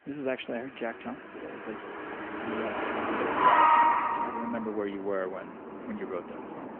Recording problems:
phone-call audio; nothing above 3 kHz
traffic noise; very loud; throughout; 10 dB above the speech

